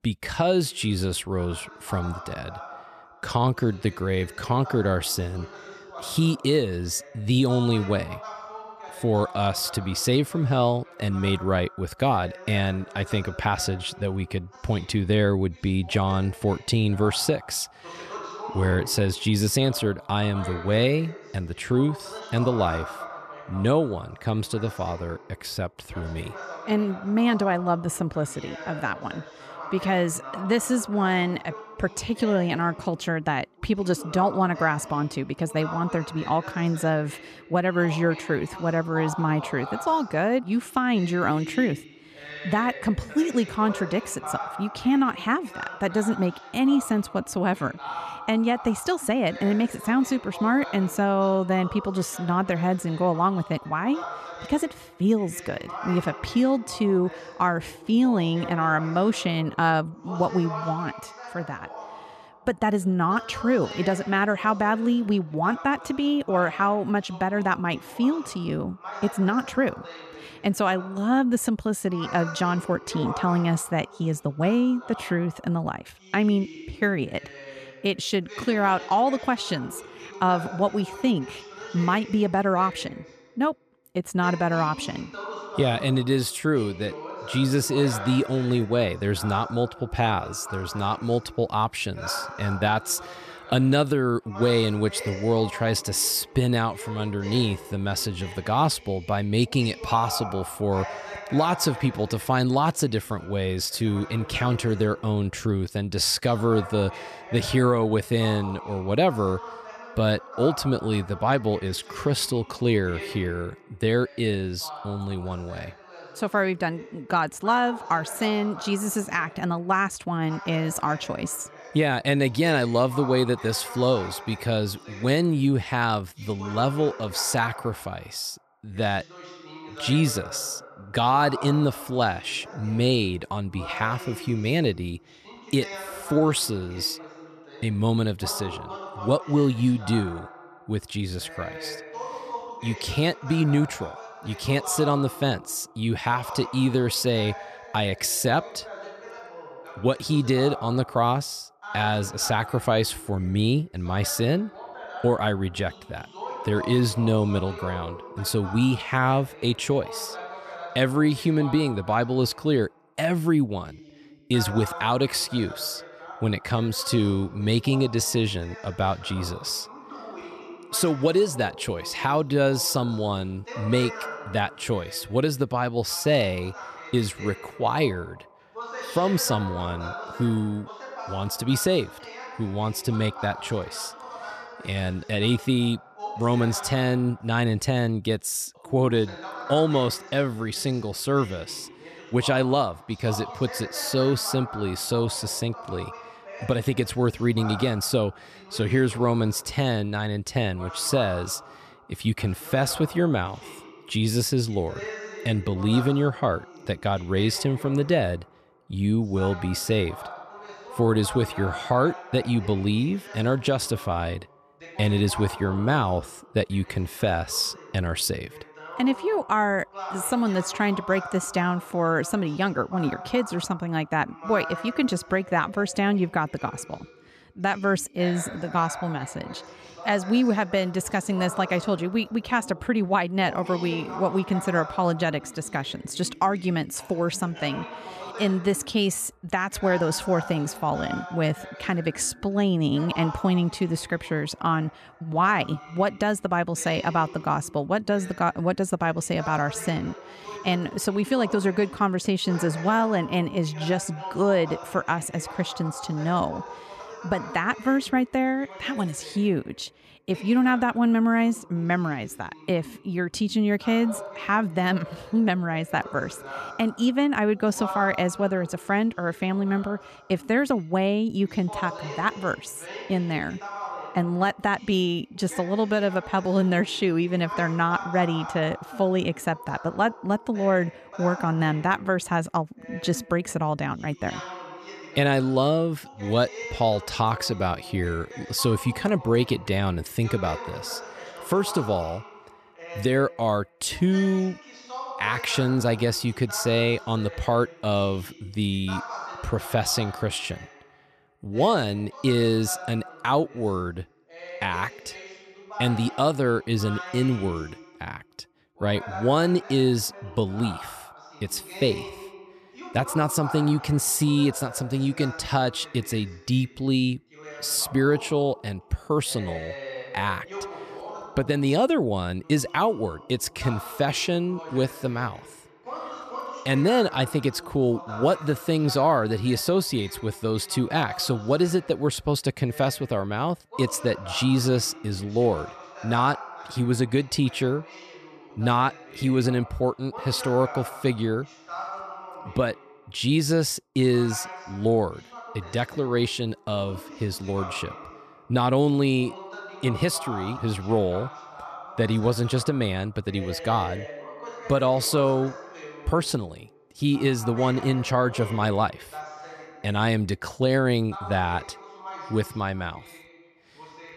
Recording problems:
voice in the background; noticeable; throughout; 15 dB below the speech

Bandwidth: 14 kHz